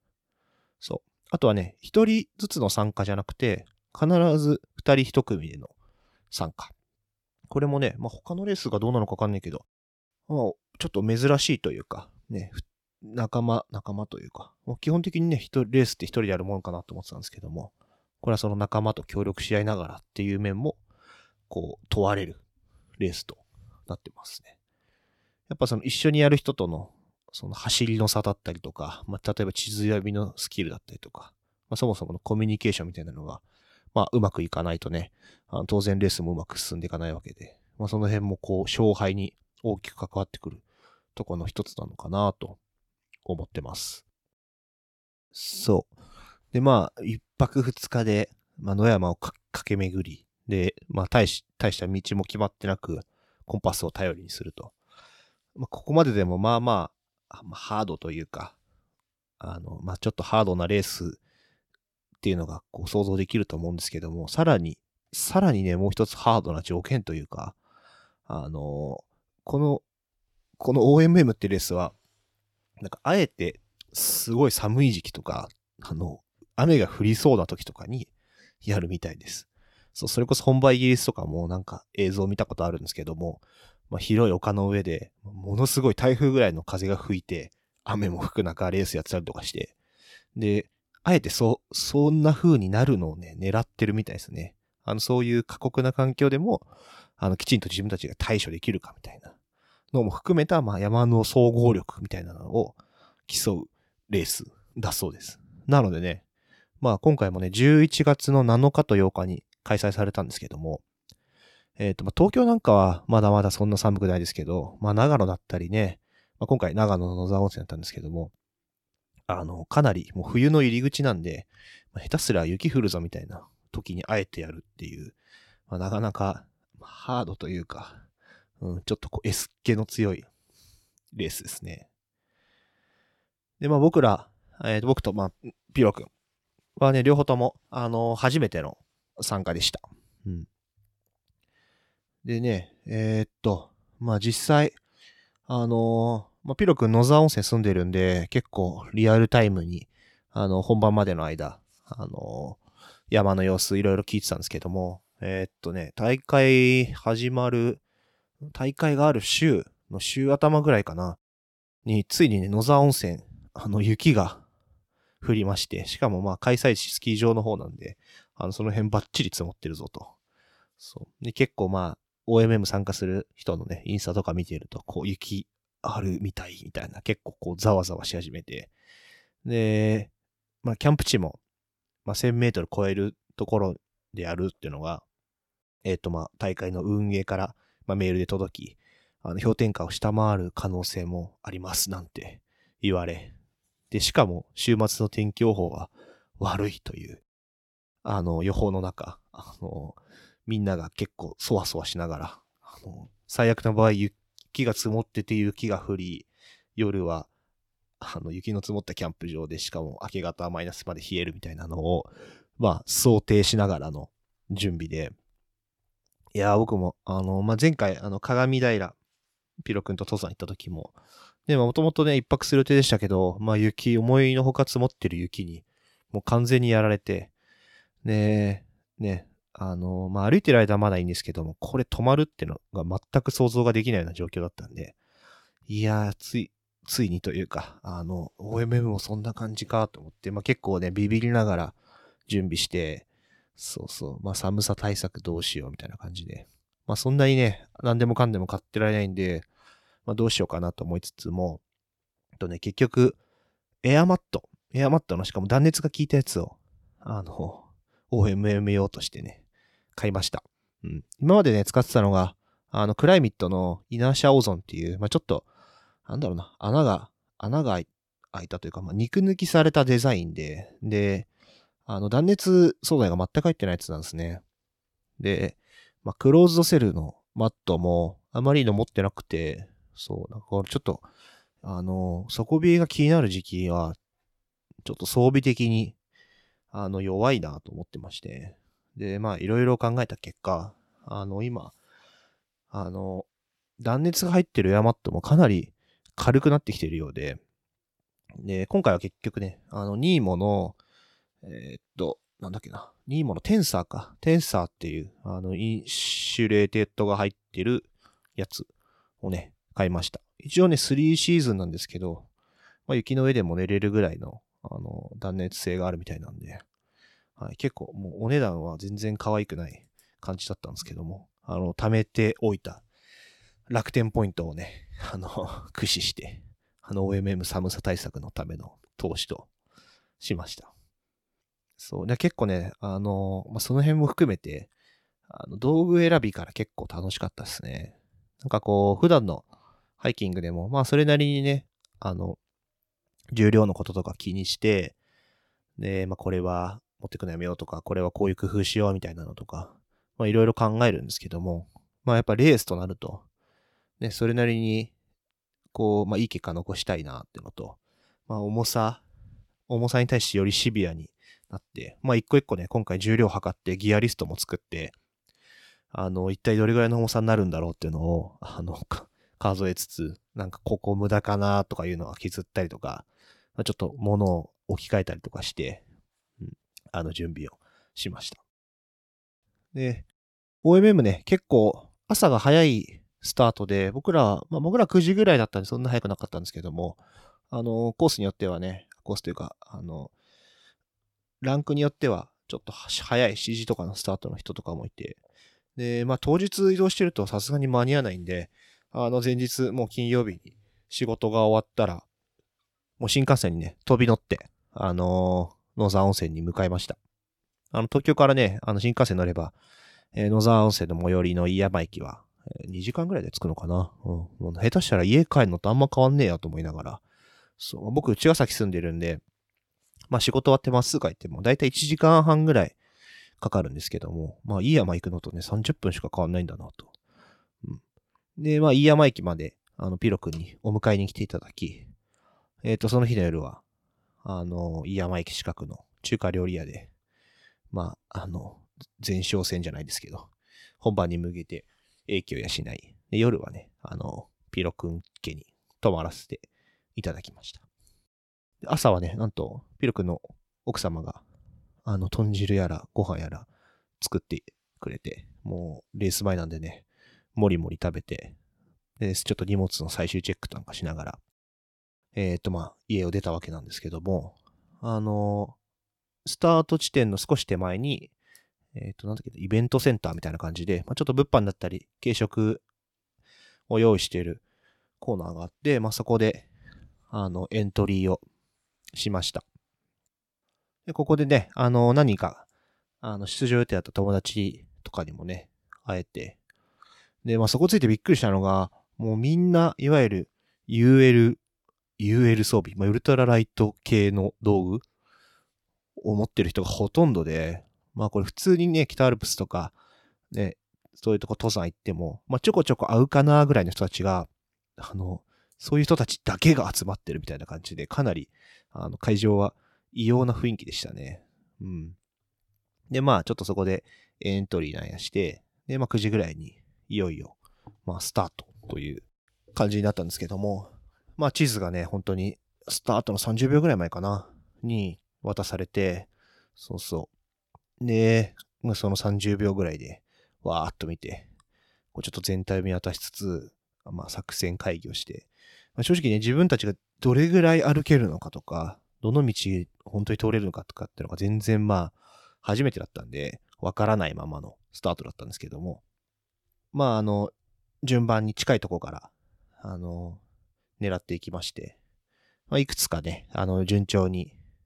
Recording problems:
none

